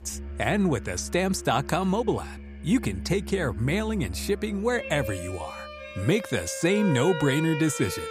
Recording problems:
background music; noticeable; throughout; 10 dB below the speech

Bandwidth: 15 kHz